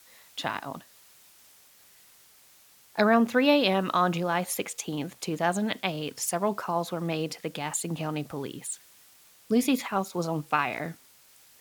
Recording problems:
hiss; faint; throughout; 25 dB below the speech

